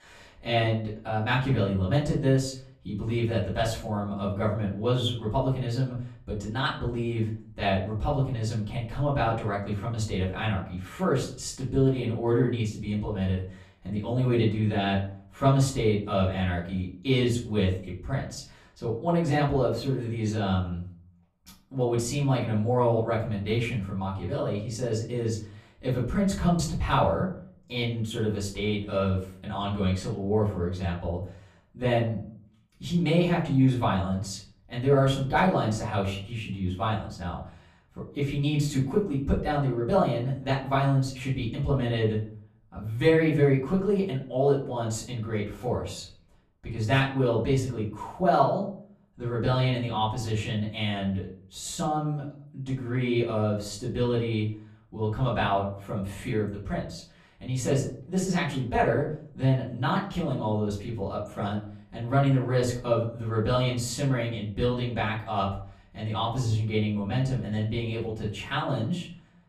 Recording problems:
off-mic speech; far
room echo; slight; dies away in 0.4 s

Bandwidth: 14.5 kHz